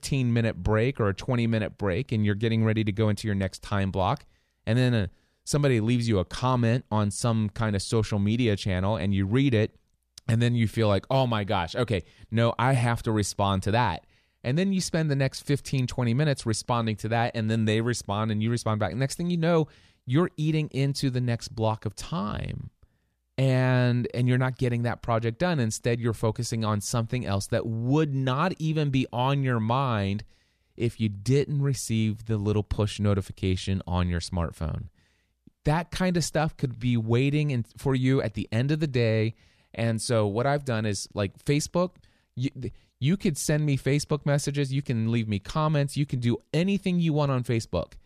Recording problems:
none

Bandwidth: 14.5 kHz